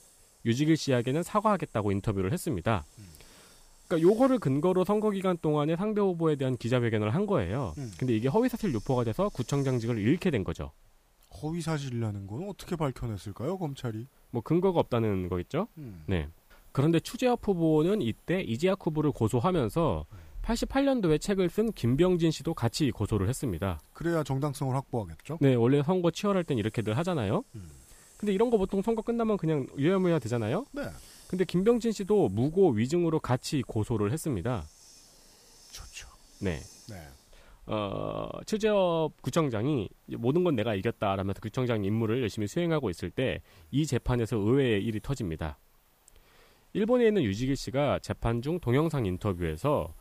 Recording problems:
hiss; faint; throughout; 30 dB below the speech

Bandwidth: 15 kHz